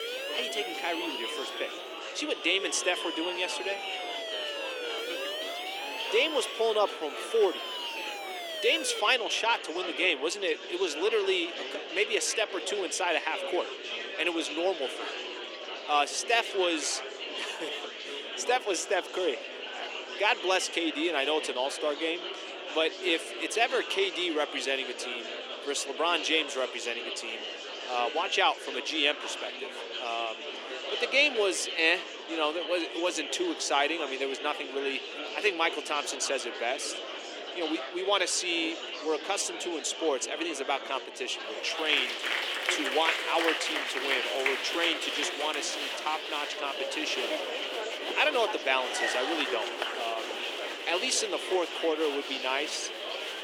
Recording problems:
thin; very; fading below 350 Hz
murmuring crowd; loud; throughout; 5 dB below the speech
siren; noticeable; until 9 s; peak 5 dB below the speech

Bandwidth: 17.5 kHz